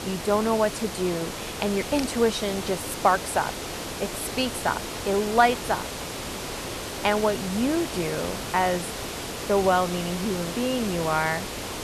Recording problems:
hiss; loud; throughout; 6 dB below the speech

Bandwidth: 13.5 kHz